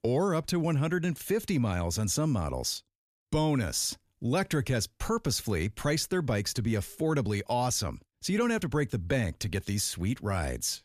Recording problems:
none

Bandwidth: 14.5 kHz